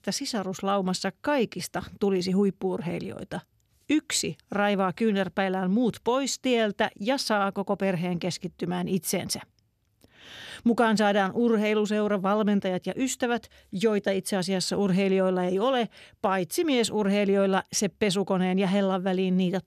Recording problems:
none

